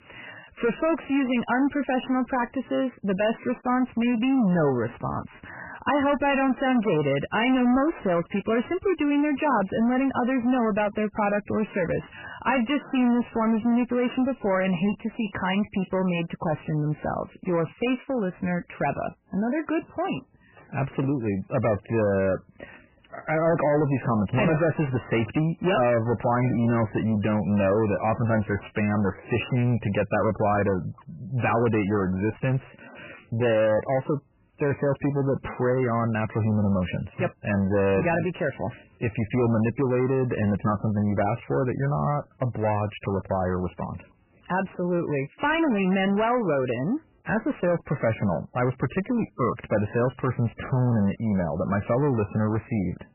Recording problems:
distortion; heavy; 7 dB below the speech
garbled, watery; badly; nothing above 3 kHz

